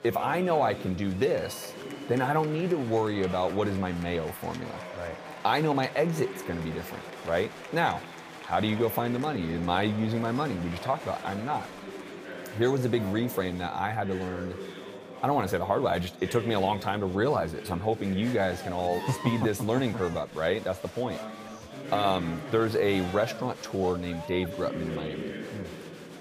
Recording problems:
chatter from many people; noticeable; throughout; 10 dB below the speech

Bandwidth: 15 kHz